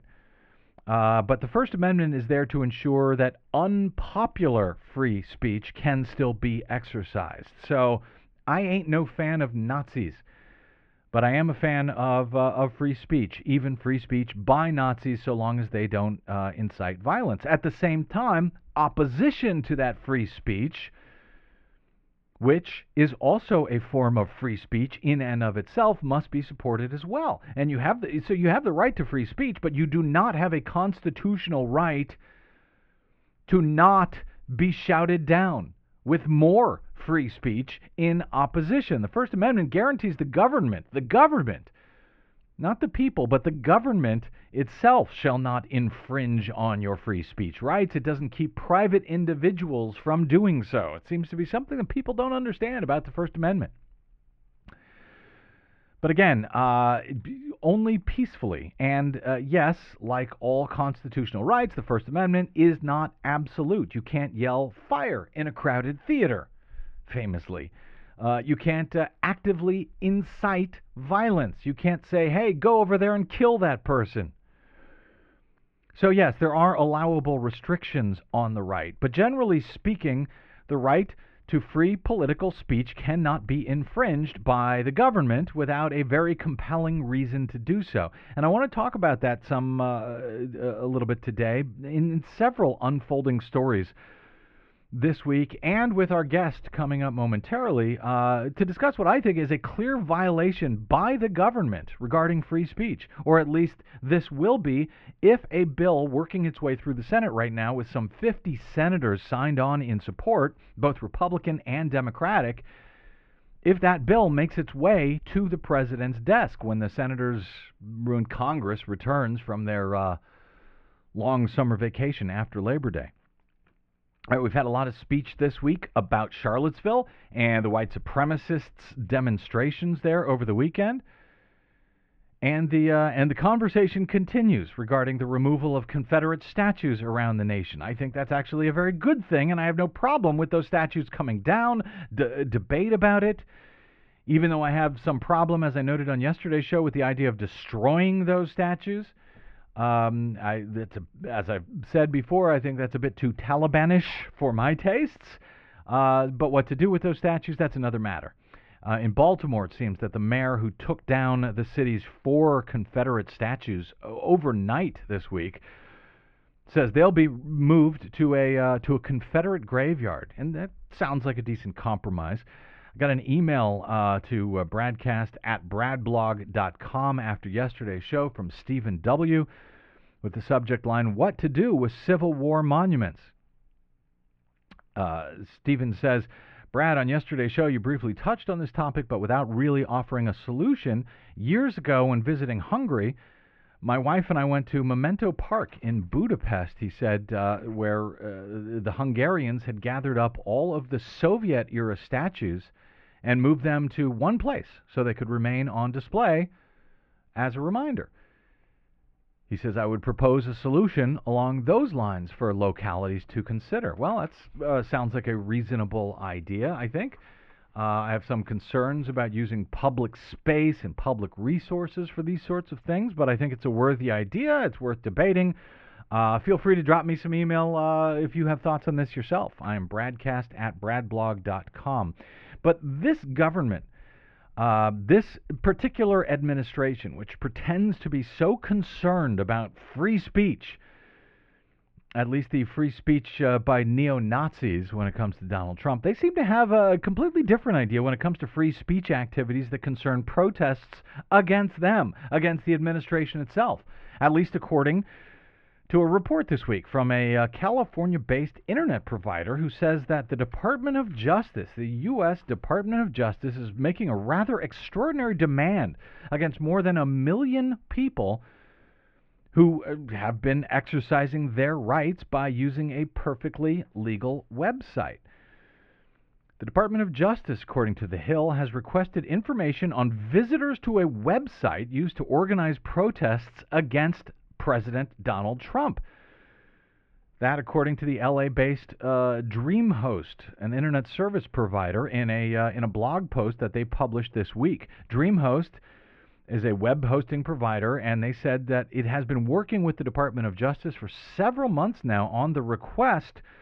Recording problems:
muffled; very; fading above 2.5 kHz

